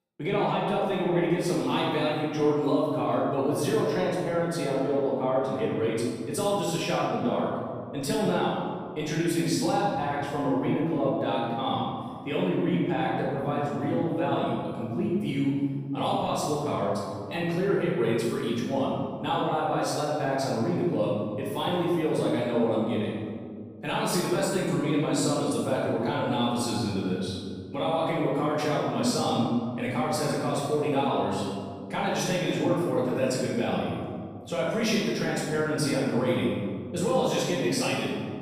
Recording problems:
room echo; strong; dies away in 1.8 s
off-mic speech; far

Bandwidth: 15 kHz